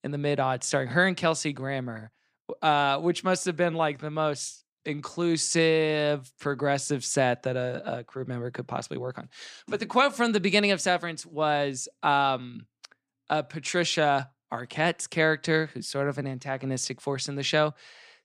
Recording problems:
none

